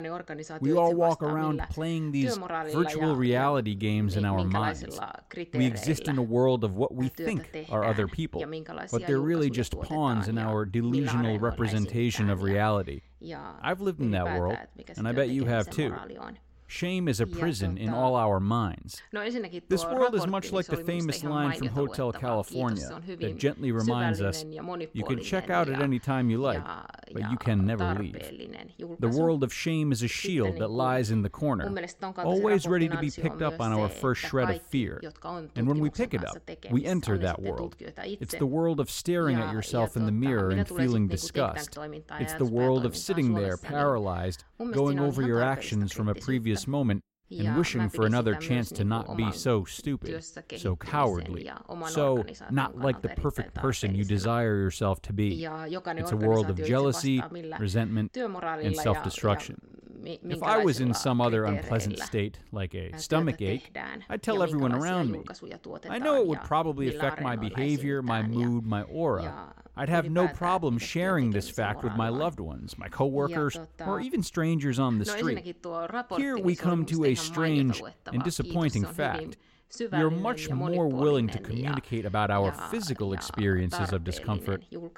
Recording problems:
voice in the background; loud; throughout; 10 dB below the speech

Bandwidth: 16 kHz